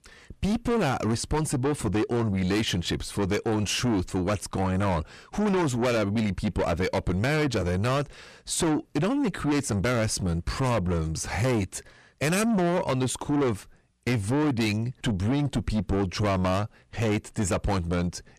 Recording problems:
distortion; heavy; 7 dB below the speech

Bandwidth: 14 kHz